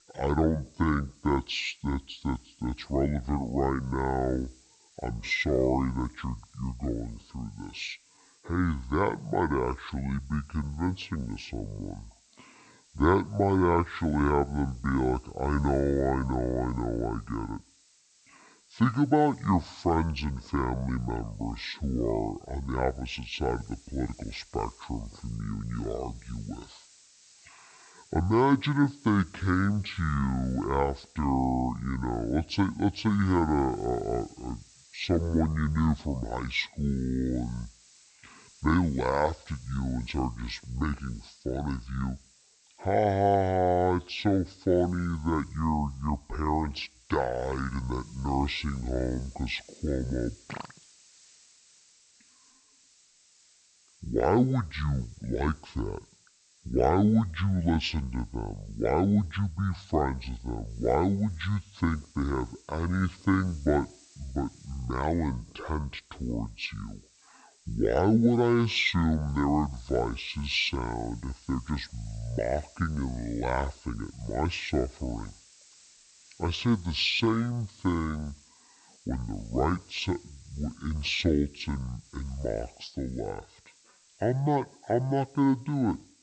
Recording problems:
wrong speed and pitch; too slow and too low; 0.5 times normal speed
high frequencies cut off; slight; nothing above 8 kHz
hiss; faint; throughout; 25 dB below the speech

